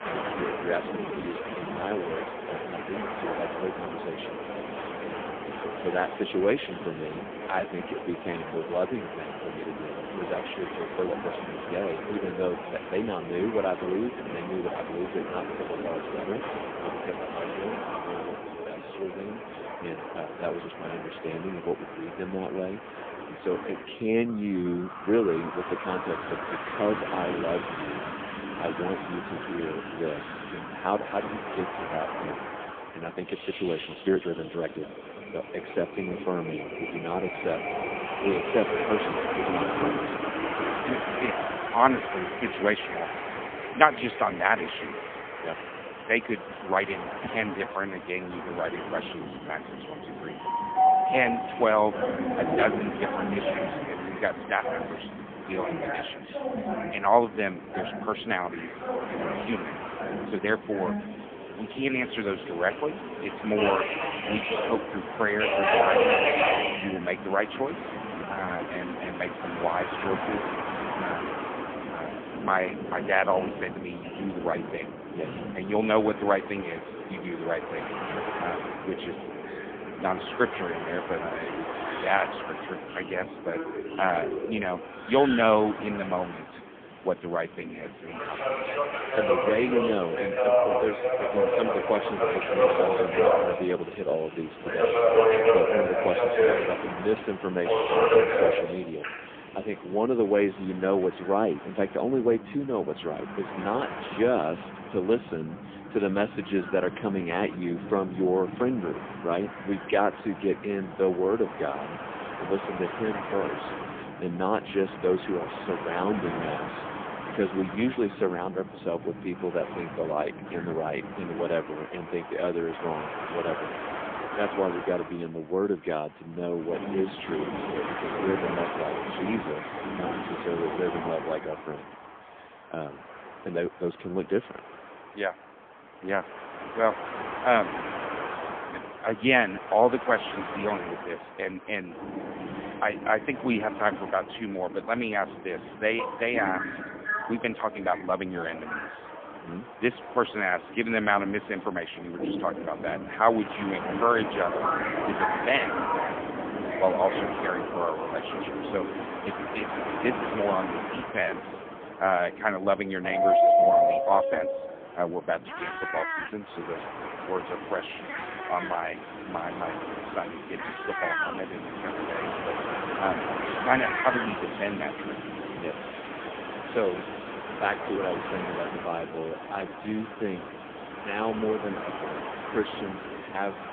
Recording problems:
phone-call audio; poor line; nothing above 3.5 kHz
animal sounds; loud; throughout; 6 dB below the speech
train or aircraft noise; loud; throughout; 2 dB below the speech
uneven, jittery; strongly; from 1 s to 3:00

